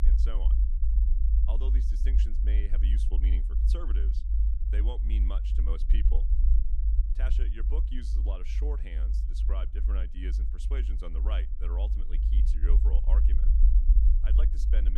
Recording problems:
low rumble; loud; throughout; 3 dB below the speech
abrupt cut into speech; at the end

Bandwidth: 15 kHz